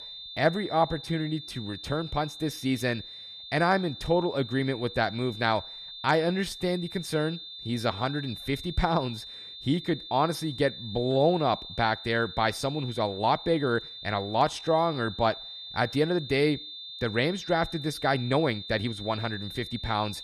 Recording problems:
high-pitched whine; noticeable; throughout; 3.5 kHz, 10 dB below the speech
uneven, jittery; strongly; from 1 to 19 s

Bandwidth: 14 kHz